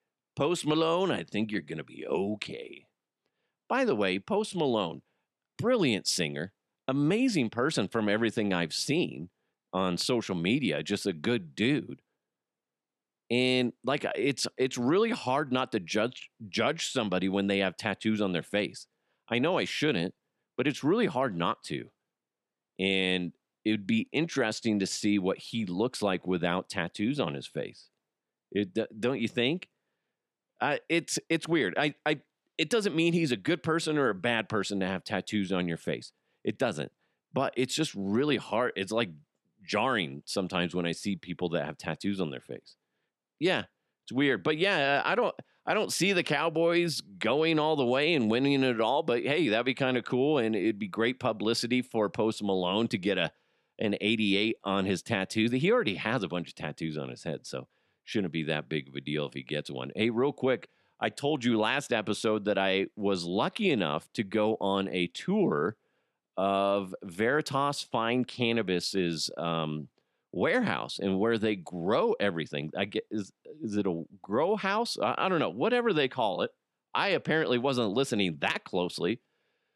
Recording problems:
none

